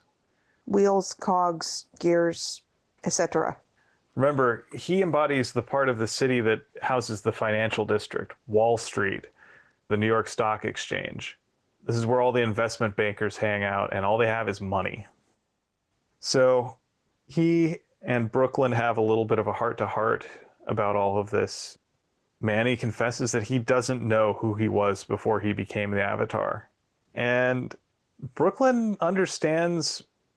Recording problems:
garbled, watery; slightly

